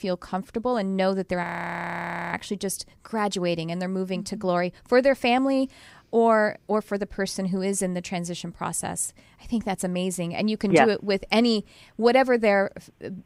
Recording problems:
audio freezing; at 1.5 s for 1 s

